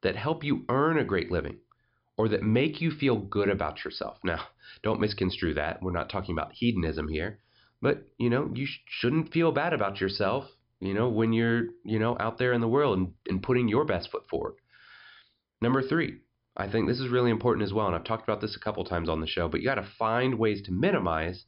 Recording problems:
high frequencies cut off; noticeable; nothing above 5.5 kHz

